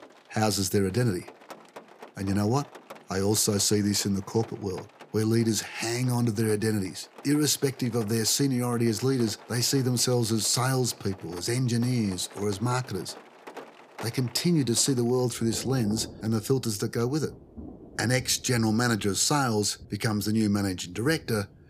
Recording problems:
rain or running water; faint; throughout; 20 dB below the speech

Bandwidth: 15 kHz